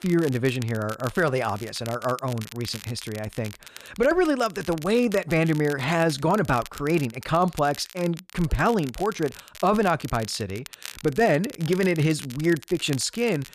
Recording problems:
crackle, like an old record; noticeable; 15 dB below the speech

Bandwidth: 14.5 kHz